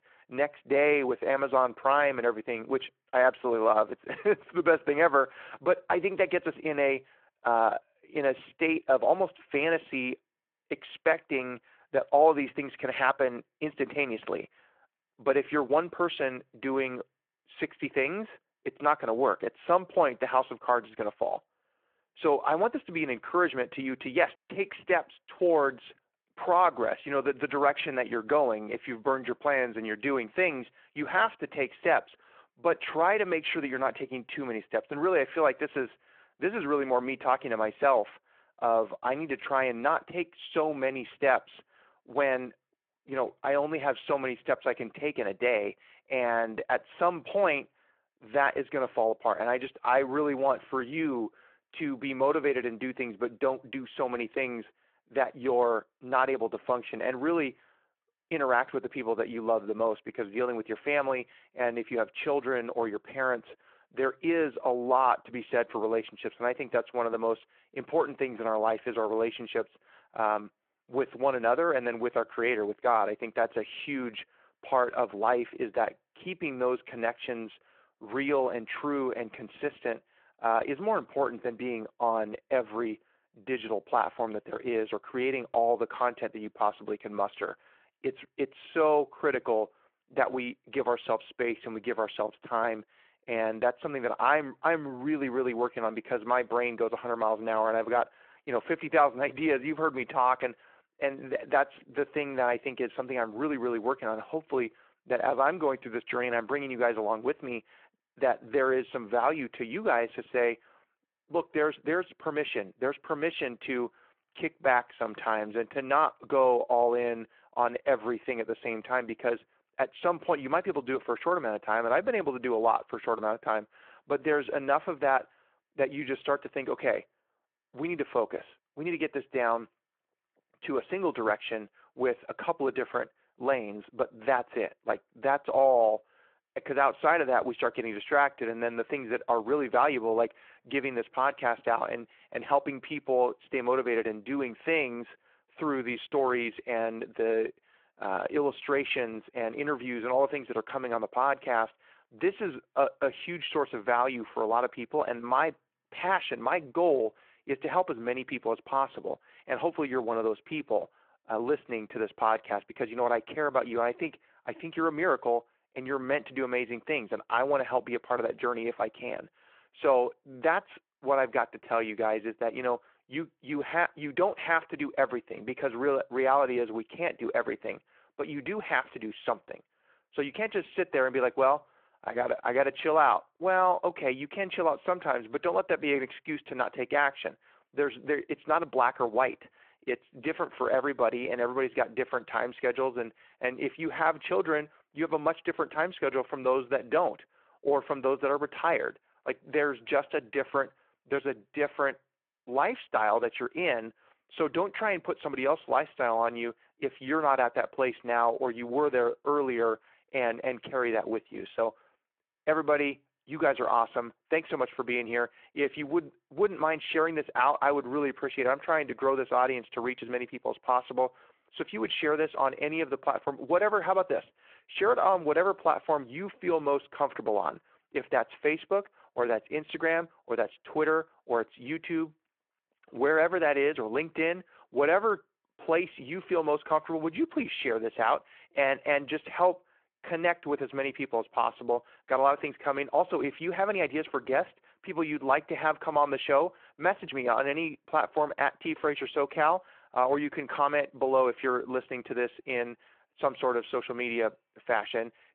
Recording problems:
phone-call audio

